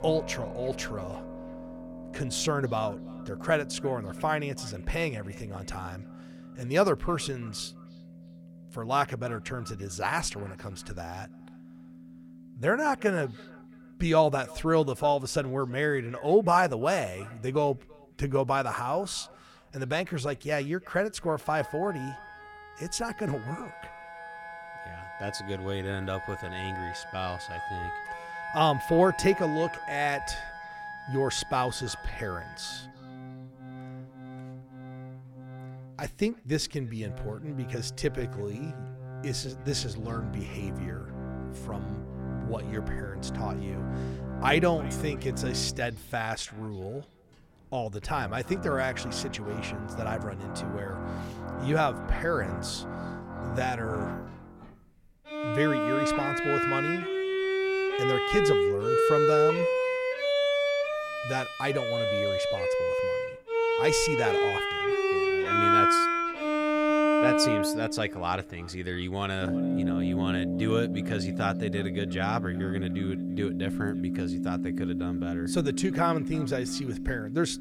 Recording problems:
echo of what is said; faint; throughout; 330 ms later, 25 dB below the speech
background music; very loud; throughout; as loud as the speech

